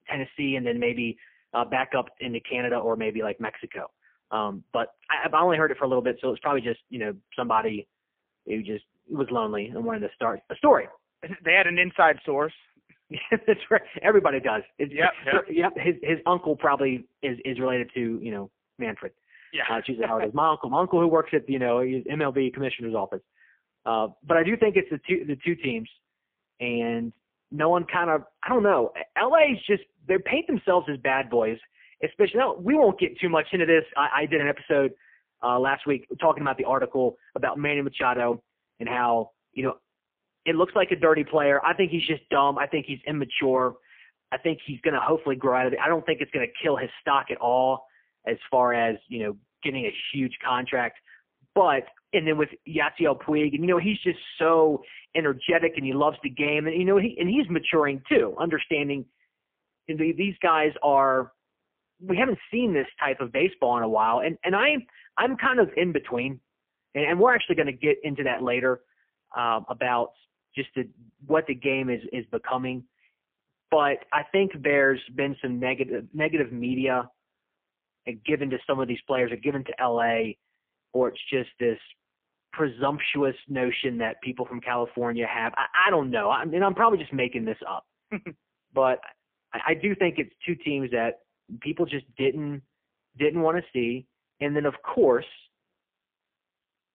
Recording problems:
phone-call audio; poor line

